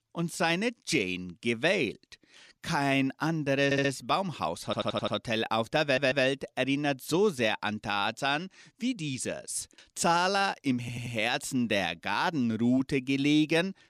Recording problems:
audio stuttering; 4 times, first at 3.5 s

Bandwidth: 14.5 kHz